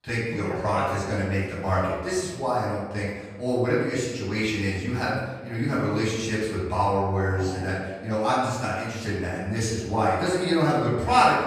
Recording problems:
off-mic speech; far
room echo; noticeable; dies away in 1.1 s

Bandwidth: 15 kHz